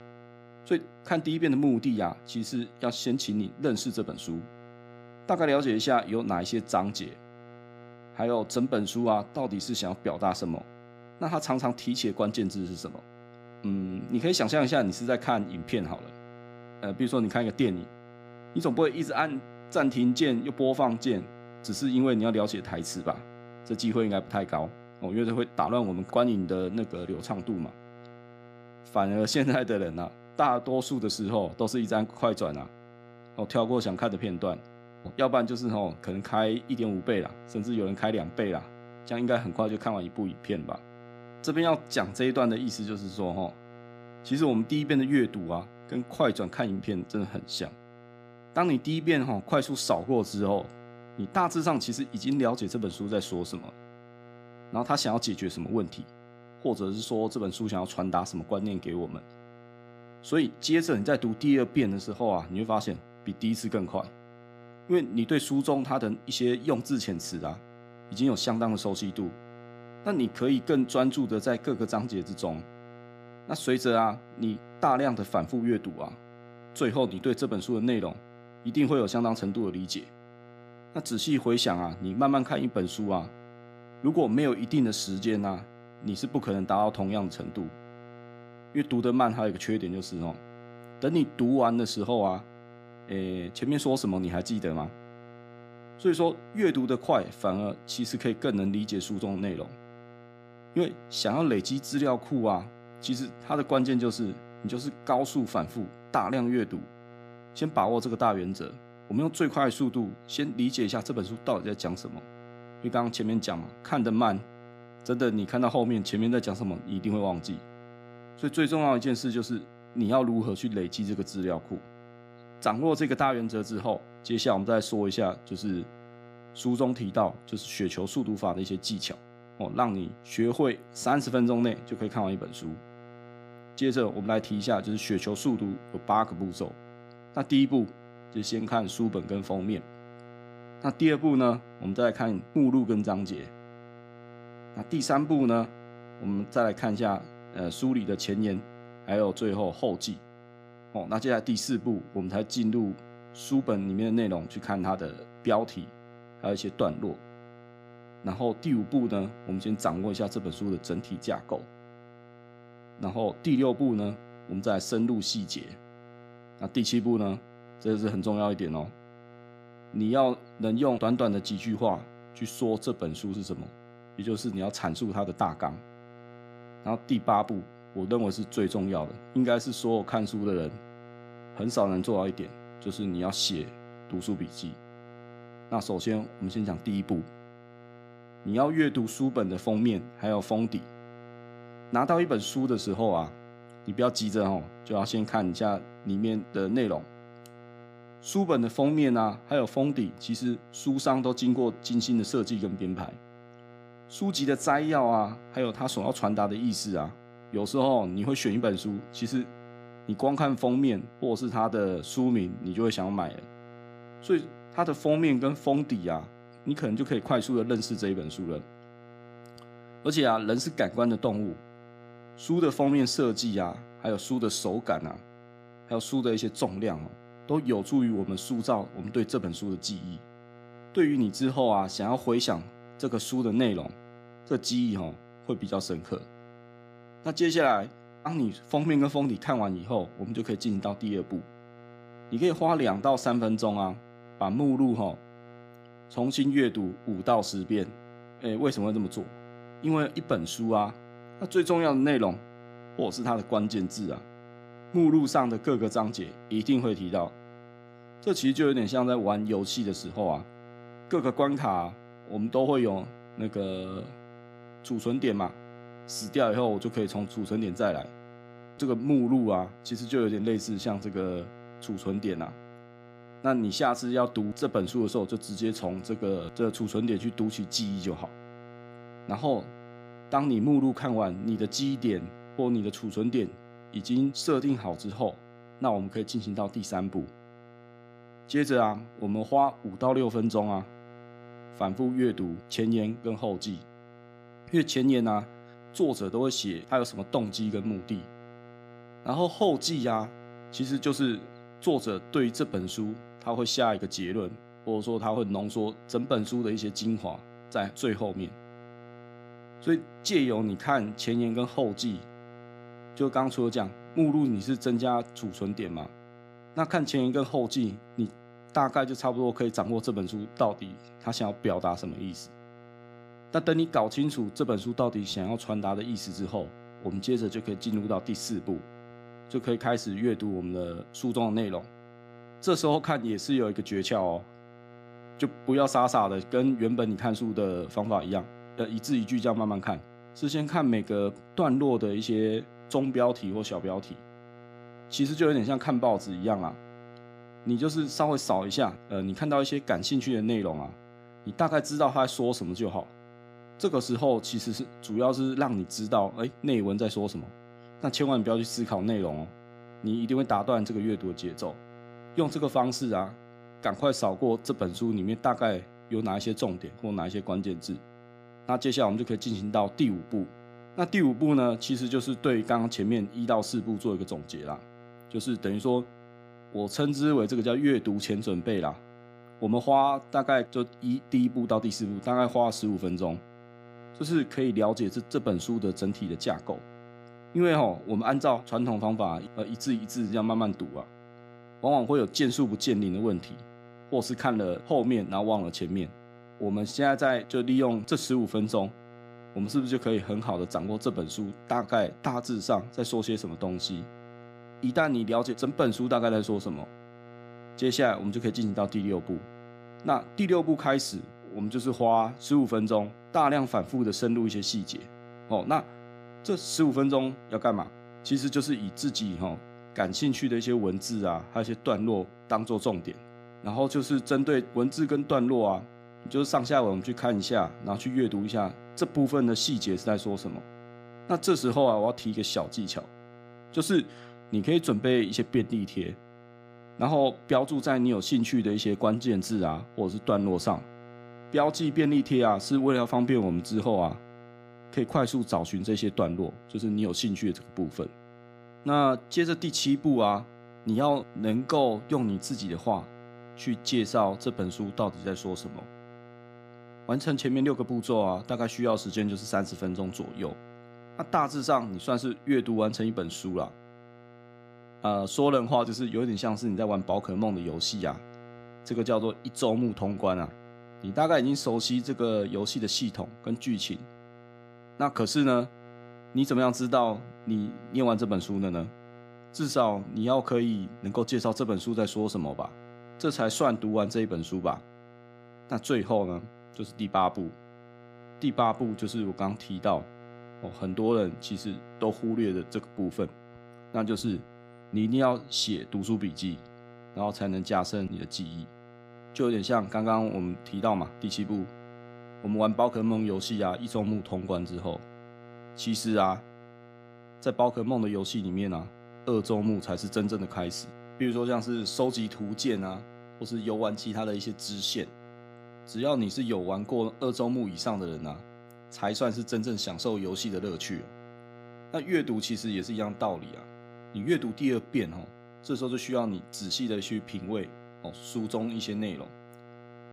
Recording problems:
electrical hum; faint; throughout; 60 Hz, 20 dB below the speech

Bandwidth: 15 kHz